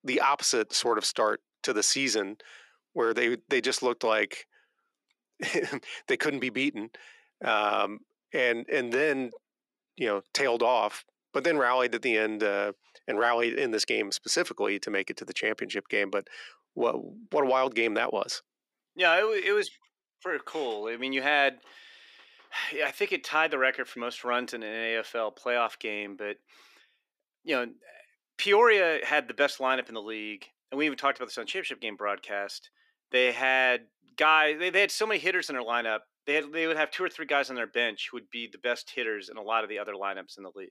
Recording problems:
thin; somewhat; fading below 300 Hz

